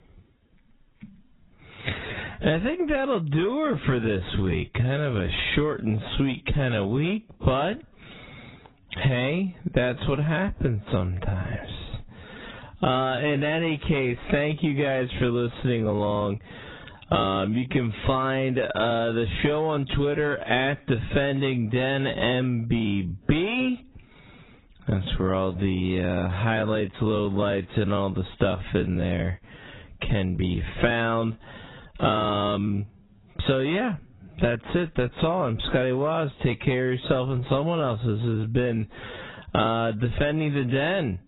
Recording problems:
garbled, watery; badly; nothing above 4 kHz
wrong speed, natural pitch; too slow; 0.6 times normal speed
distortion; slight; 10 dB below the speech
squashed, flat; somewhat

